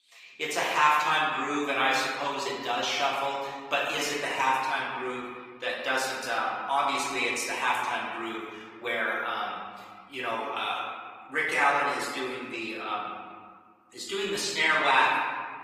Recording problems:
off-mic speech; far
thin; very; fading below 550 Hz
room echo; noticeable; dies away in 1.6 s
garbled, watery; slightly; nothing above 15 kHz

